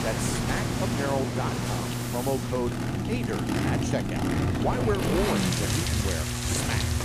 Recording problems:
rain or running water; very loud; throughout; as loud as the speech
traffic noise; very loud; throughout; 3 dB above the speech
electrical hum; loud; throughout; 60 Hz, 8 dB below the speech
household noises; noticeable; throughout; 15 dB below the speech

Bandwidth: 15 kHz